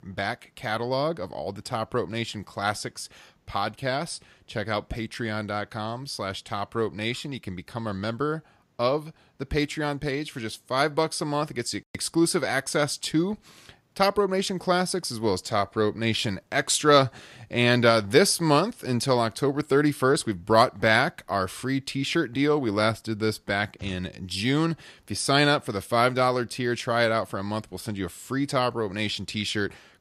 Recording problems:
none

